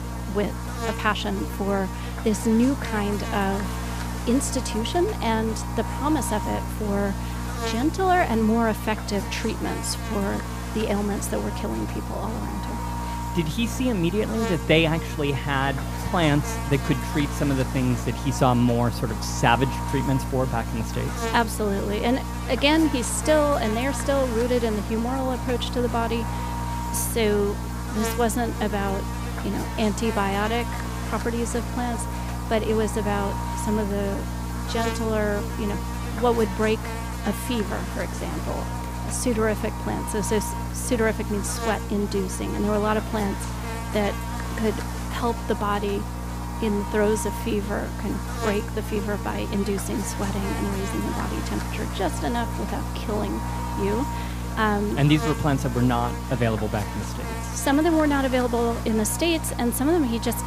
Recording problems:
electrical hum; loud; throughout; 60 Hz, 6 dB below the speech

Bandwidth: 15 kHz